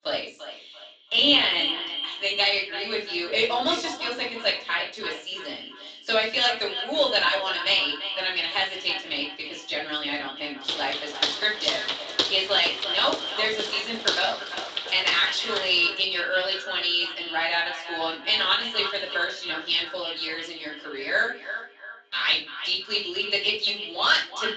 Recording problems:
echo of what is said; strong; throughout; 340 ms later, 10 dB below the speech
off-mic speech; far
thin; somewhat; fading below 300 Hz
room echo; slight; dies away in 0.3 s
garbled, watery; slightly; nothing above 7.5 kHz
footsteps; noticeable; from 11 to 16 s; peak level with the speech

